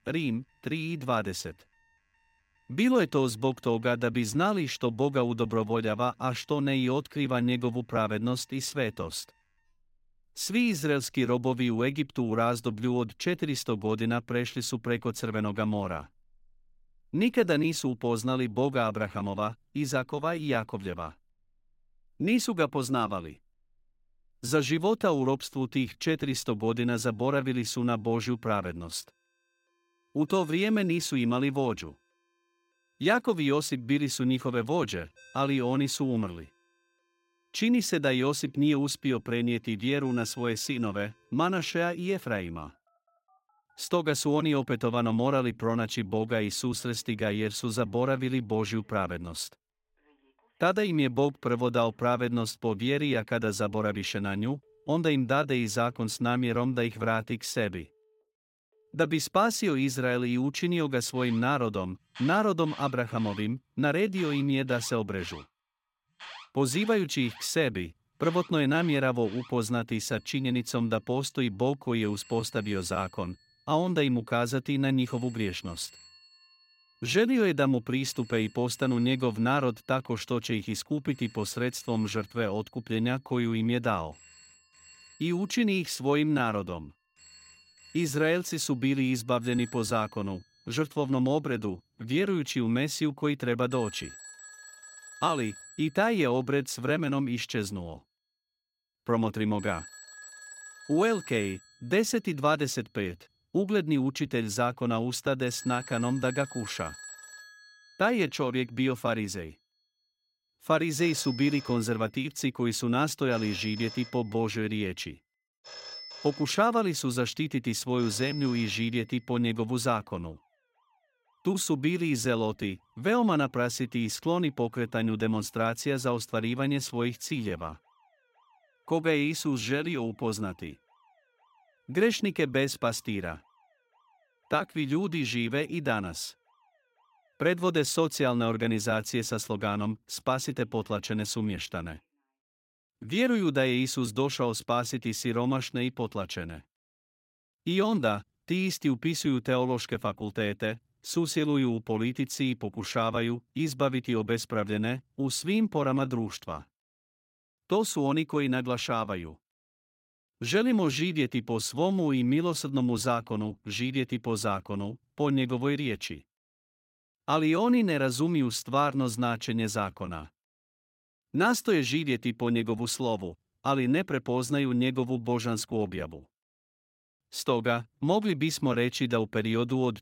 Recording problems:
alarms or sirens; noticeable; until 2:22; 20 dB below the speech

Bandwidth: 16 kHz